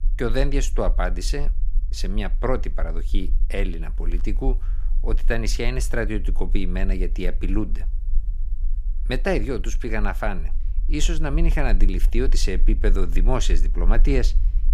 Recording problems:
low rumble; faint; throughout; 25 dB below the speech

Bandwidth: 15.5 kHz